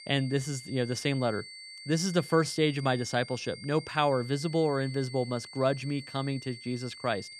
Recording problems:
high-pitched whine; noticeable; throughout; 4.5 kHz, 15 dB below the speech

